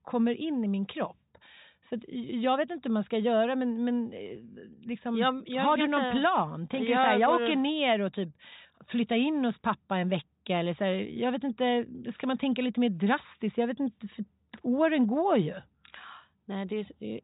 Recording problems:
high frequencies cut off; severe; nothing above 4 kHz

